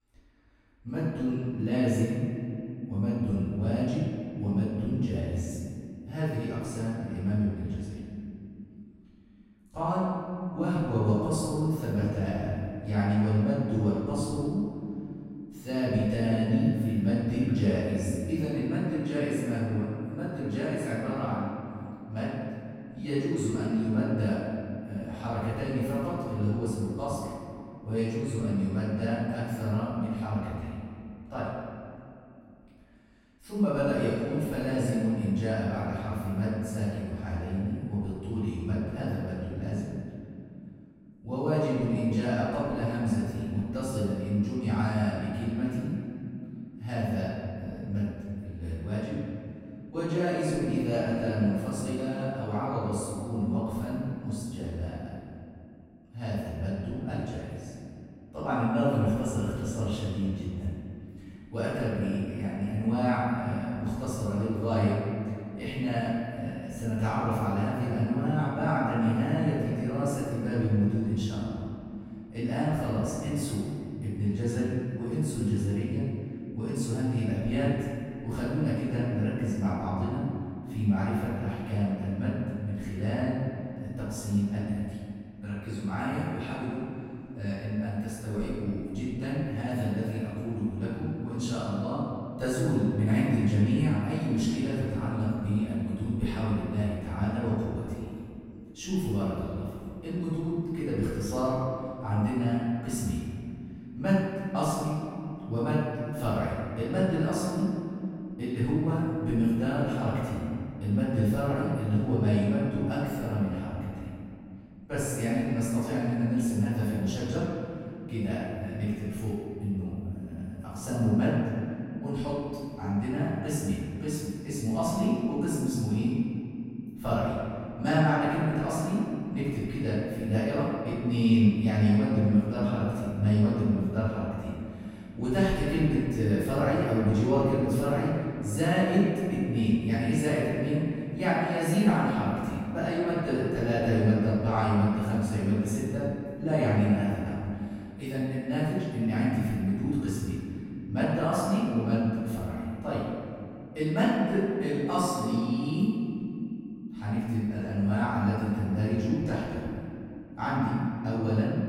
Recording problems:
room echo; strong; dies away in 2.8 s
off-mic speech; far

